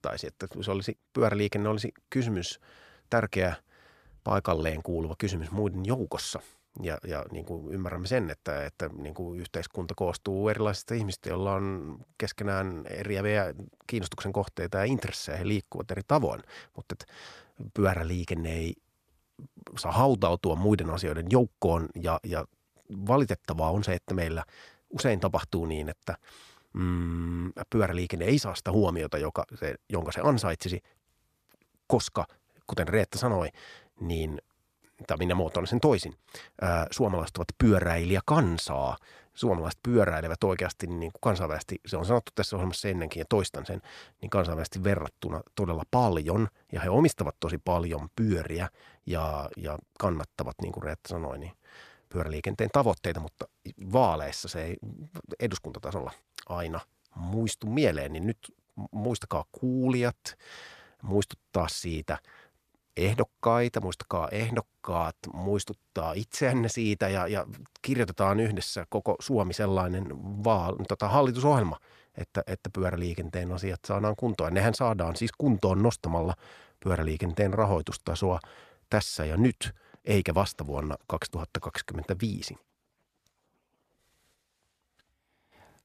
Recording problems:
none

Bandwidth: 14.5 kHz